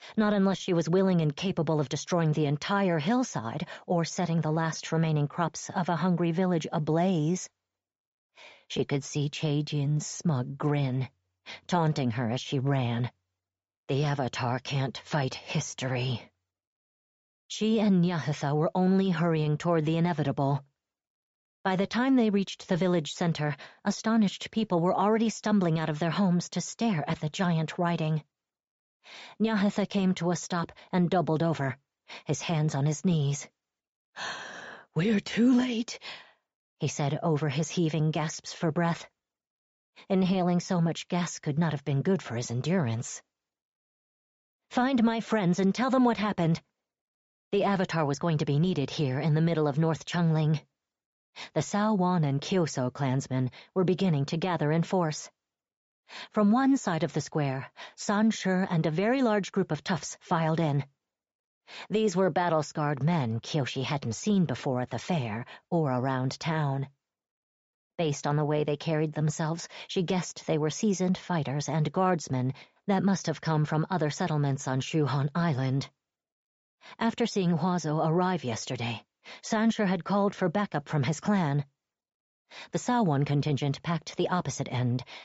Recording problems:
high frequencies cut off; noticeable; nothing above 8 kHz

